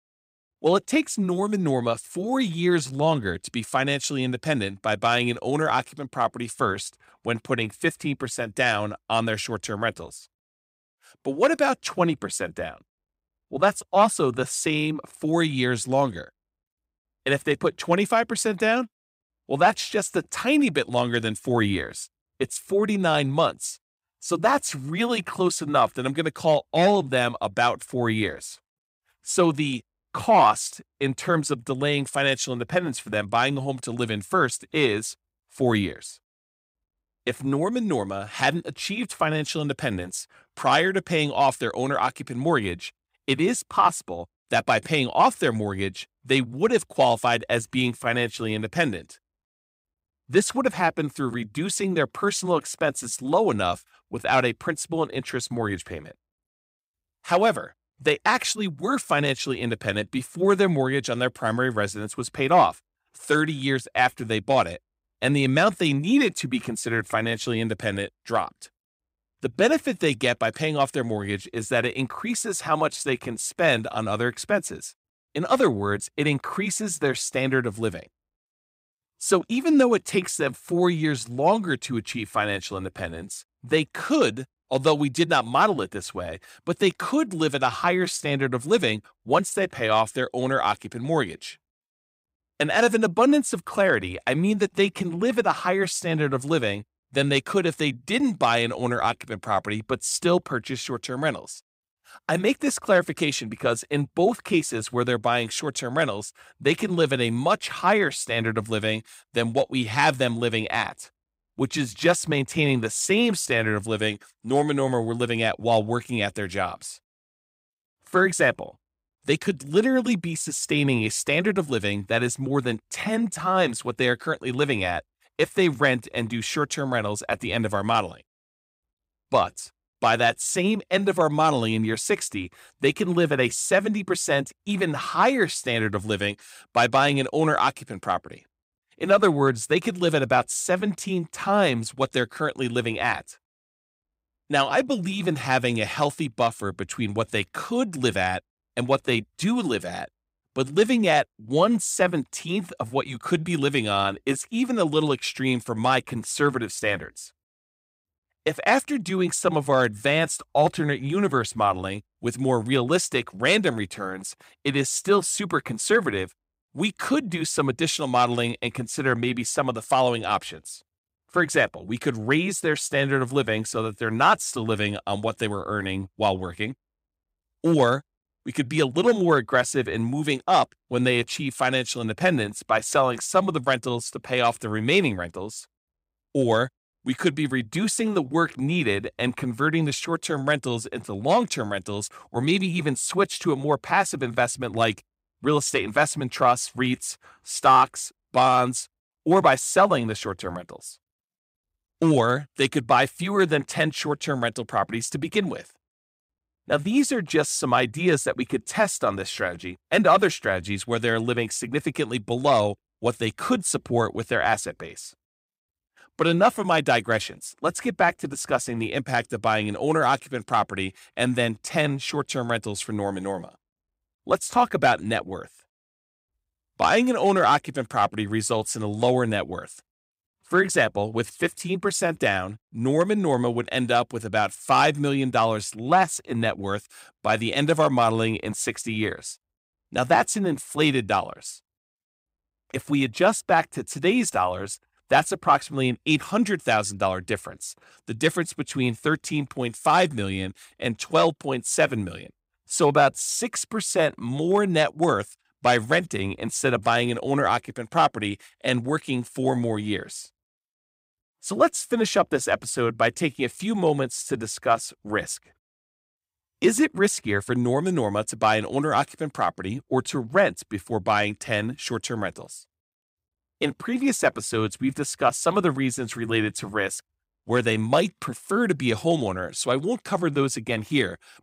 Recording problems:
none

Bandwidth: 15.5 kHz